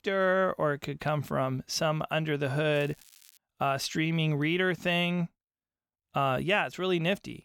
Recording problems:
crackling; faint; at 2.5 s; 25 dB below the speech

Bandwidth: 17 kHz